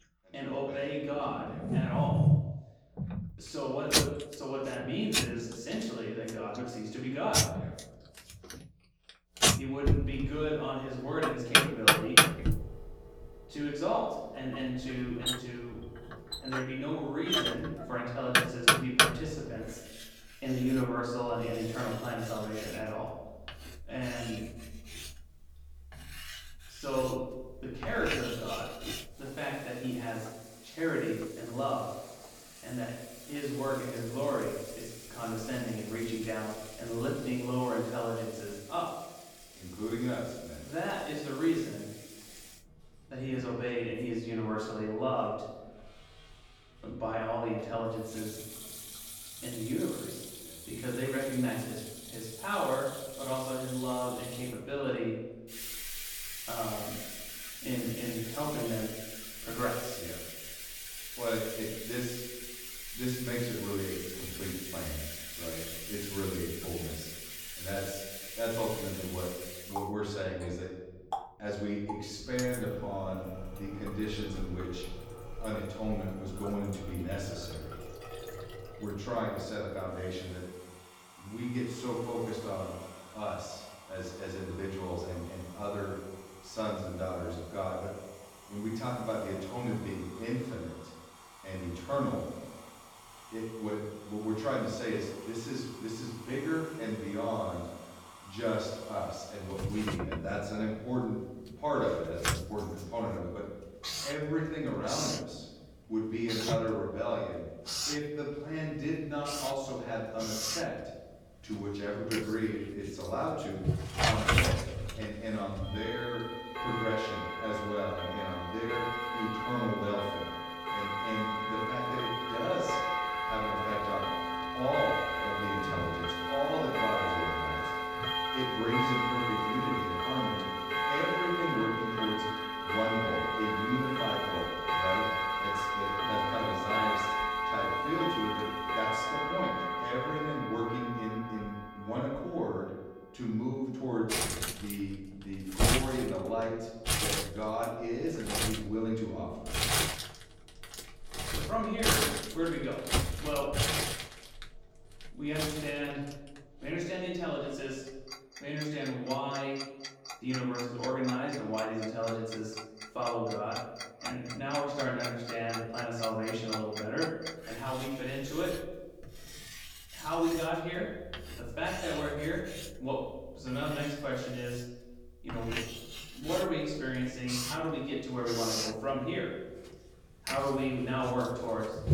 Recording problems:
off-mic speech; far
room echo; noticeable; dies away in 0.9 s
household noises; very loud; throughout; 2 dB above the speech

